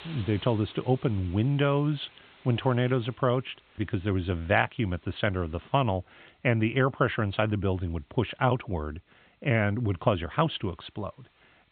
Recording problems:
high frequencies cut off; severe; nothing above 4 kHz
hiss; faint; throughout; 25 dB below the speech

